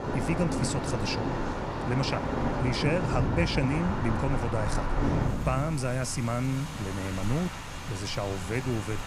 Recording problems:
rain or running water; loud; throughout; 1 dB below the speech

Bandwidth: 15 kHz